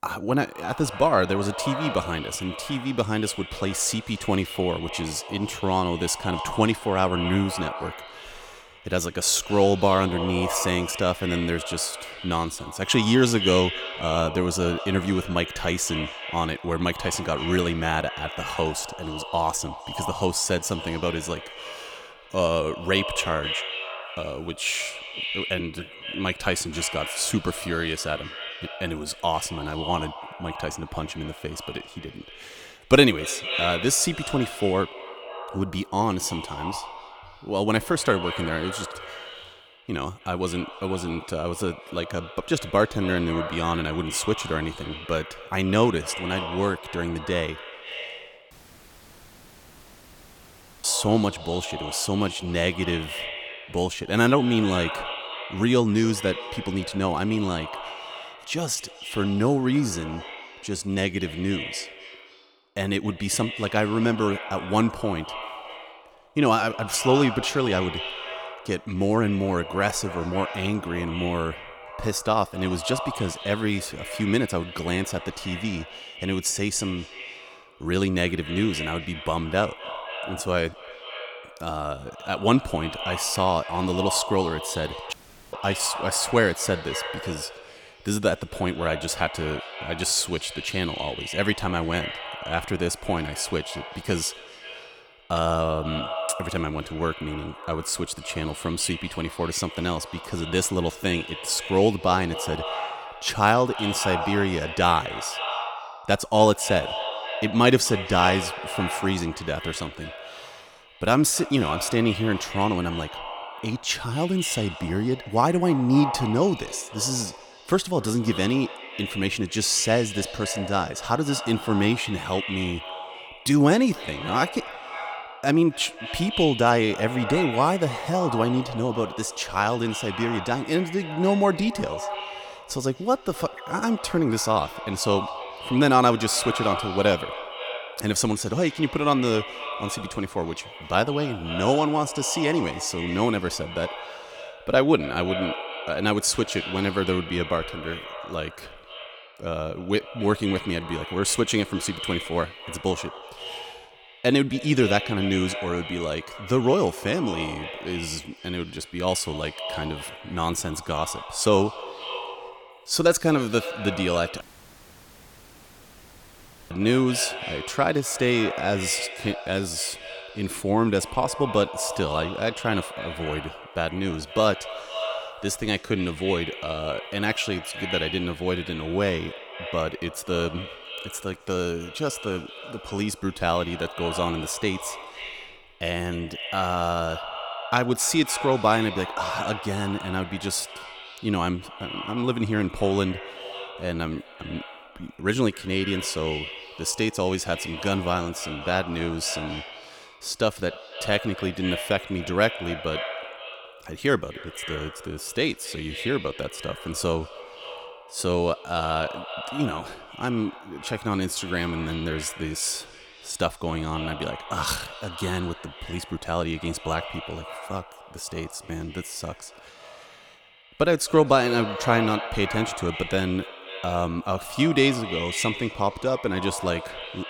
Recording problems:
echo of what is said; strong; throughout; 250 ms later, 9 dB below the speech
audio cutting out; at 49 s for 2.5 s, at 1:25 and at 2:44 for 2.5 s

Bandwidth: 18.5 kHz